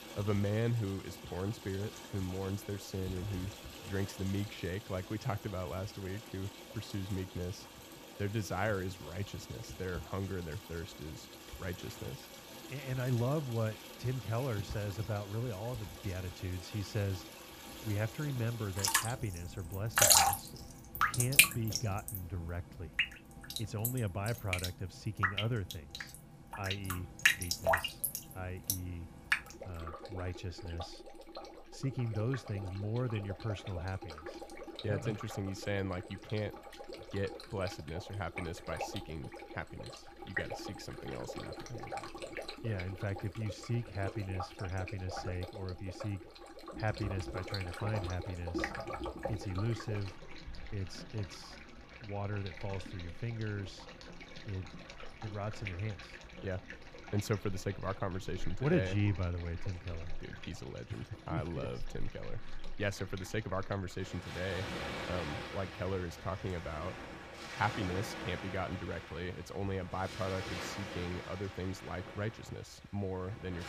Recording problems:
rain or running water; very loud; throughout; 1 dB above the speech

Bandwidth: 15 kHz